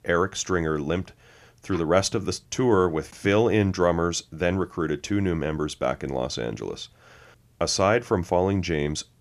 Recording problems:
none

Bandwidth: 14.5 kHz